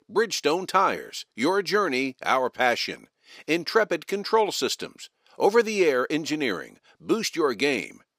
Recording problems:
thin; very slightly; fading below 300 Hz

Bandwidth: 15 kHz